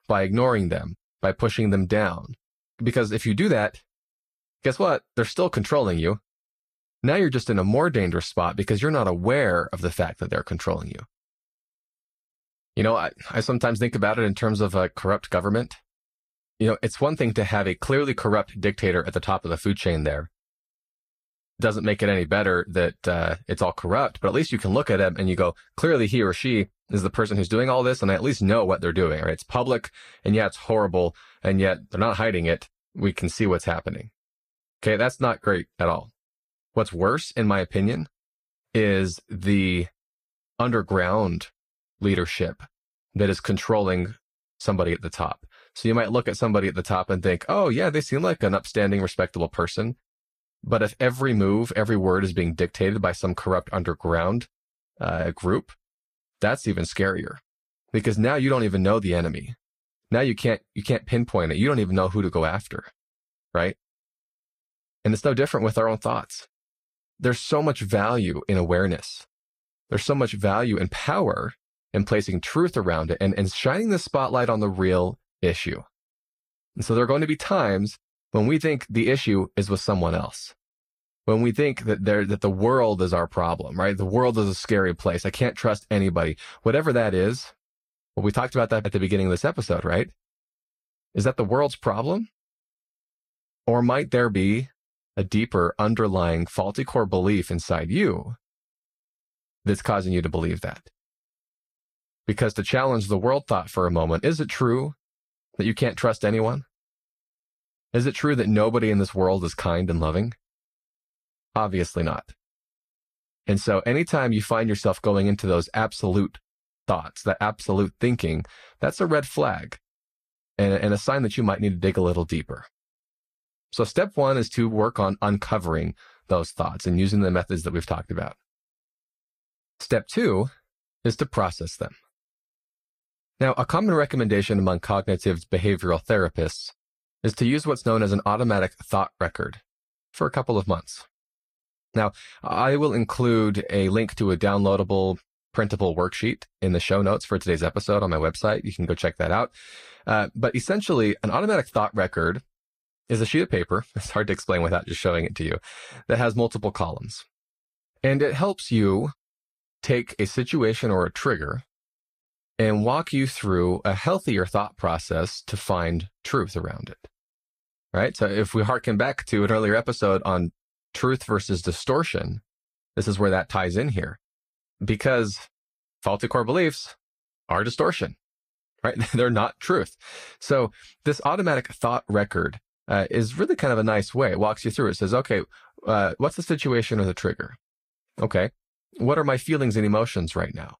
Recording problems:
garbled, watery; slightly; nothing above 15 kHz

